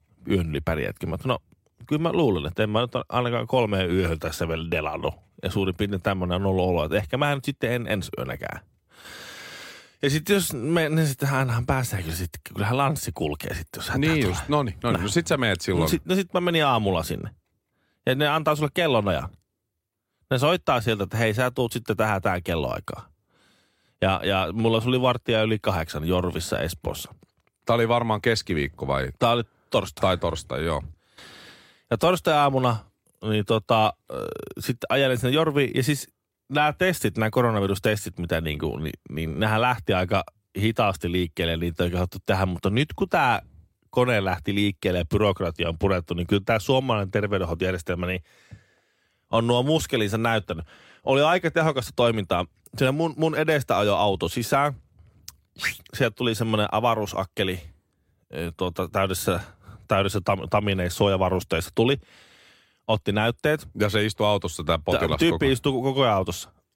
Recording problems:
none

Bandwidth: 16 kHz